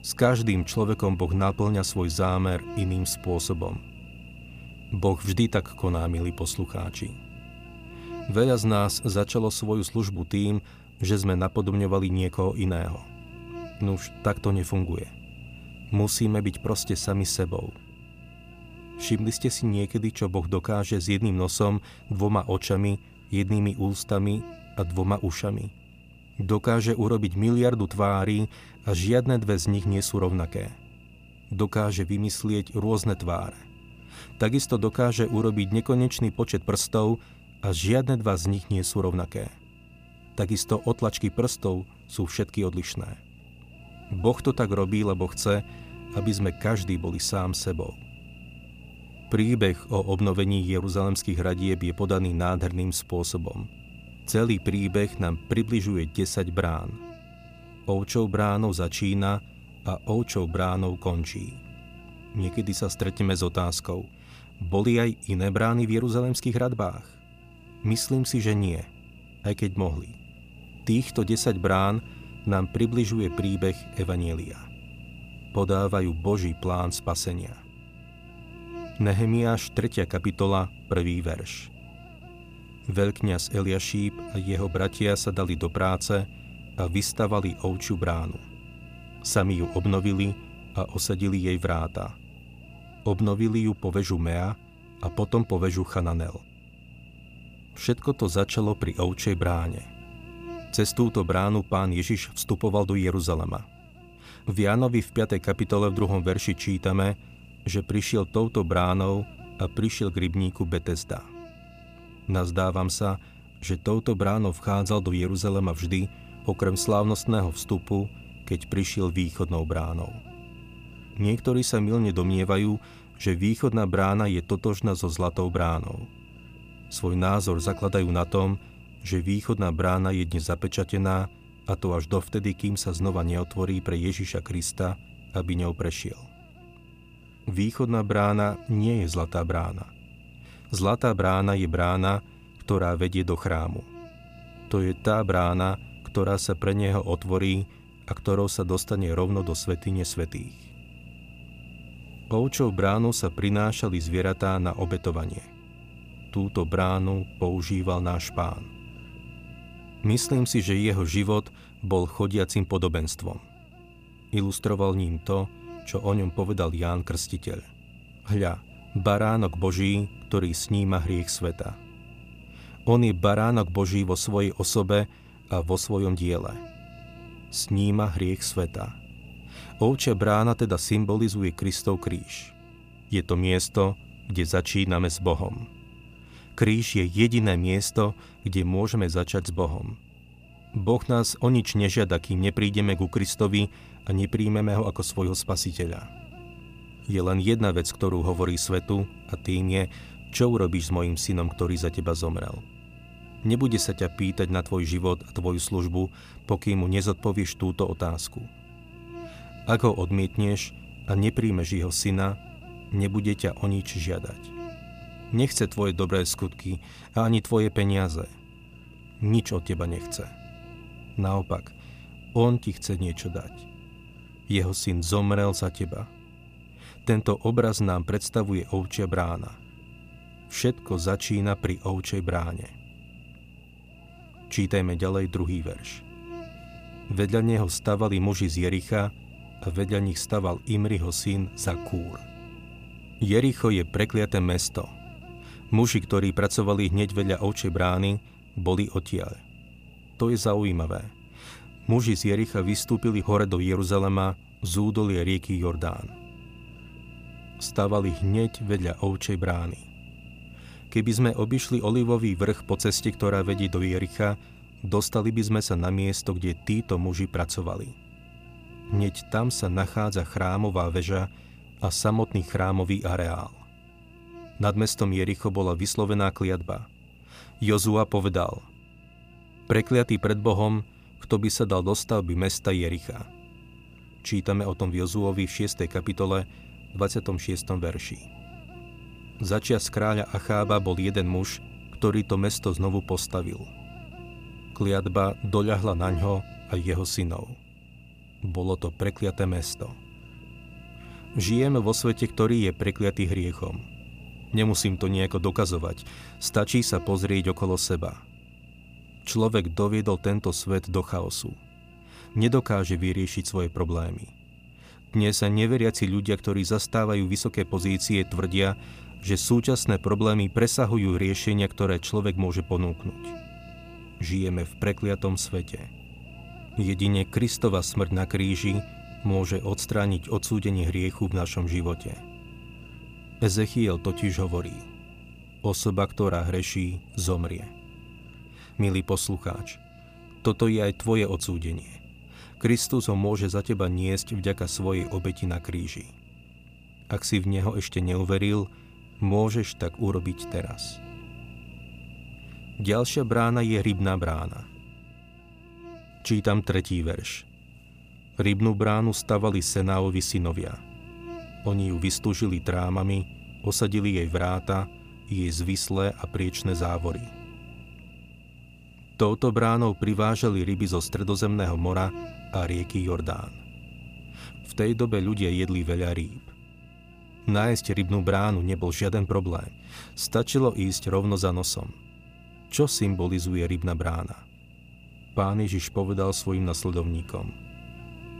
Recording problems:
electrical hum; noticeable; throughout; 60 Hz, 20 dB below the speech

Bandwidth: 15 kHz